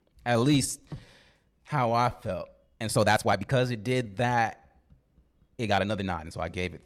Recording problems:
uneven, jittery; strongly

